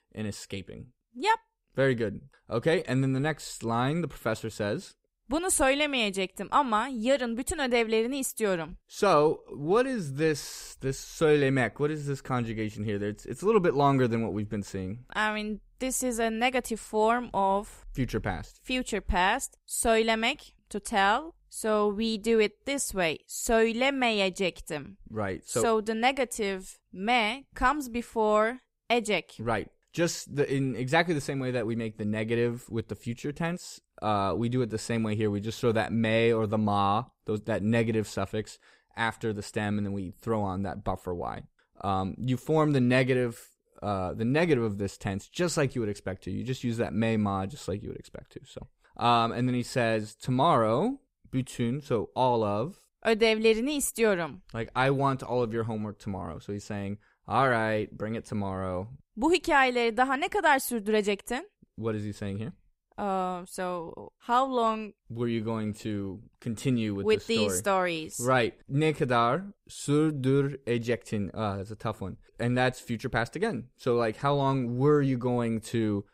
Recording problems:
none

